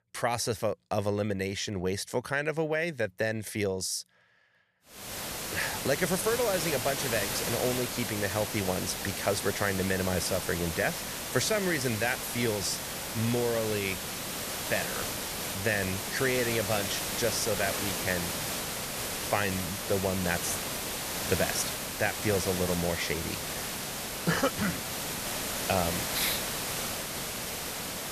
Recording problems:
hiss; loud; from 5 s on; 2 dB below the speech

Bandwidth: 14.5 kHz